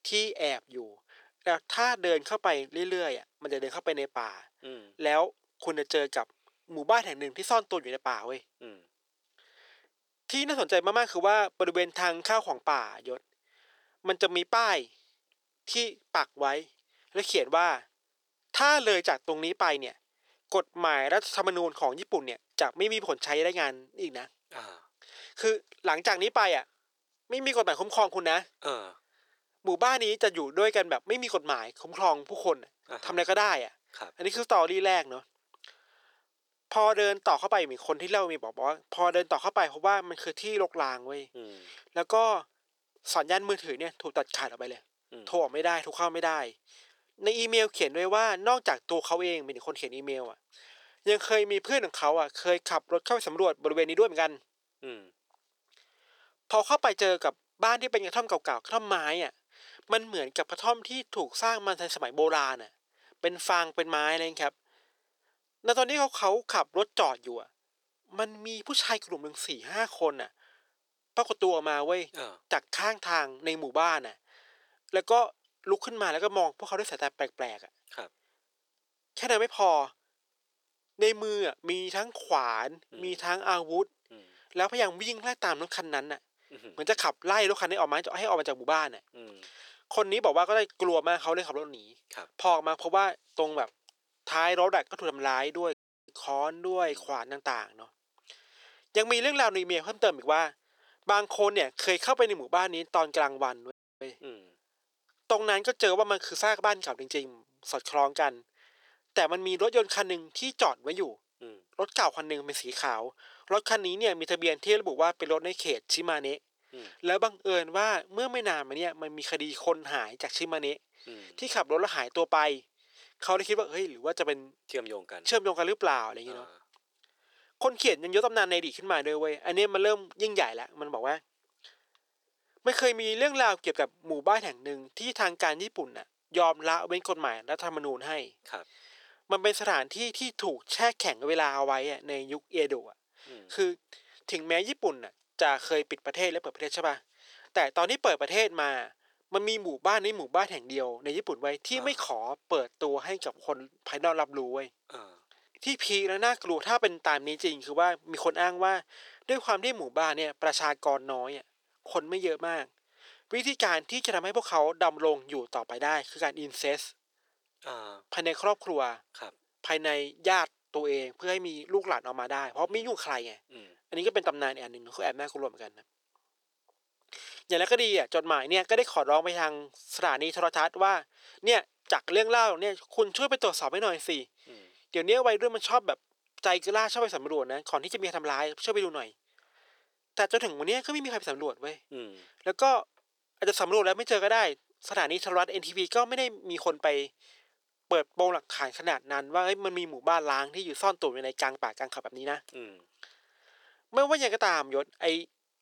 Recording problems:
thin; very; fading below 400 Hz
audio cutting out; at 1:36 and at 1:44

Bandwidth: 18.5 kHz